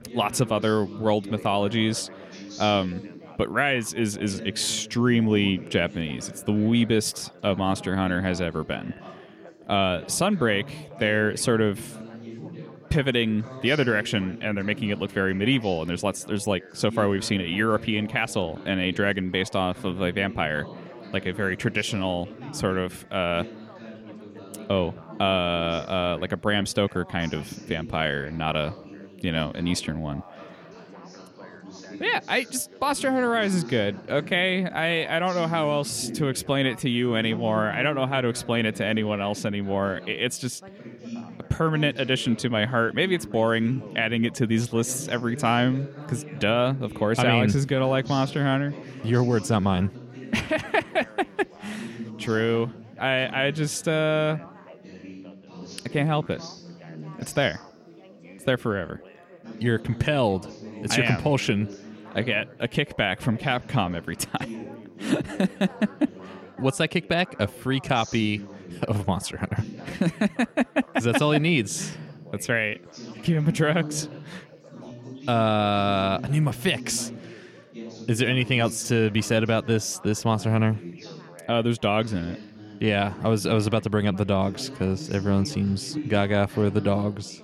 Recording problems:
background chatter; noticeable; throughout; 4 voices, 15 dB below the speech

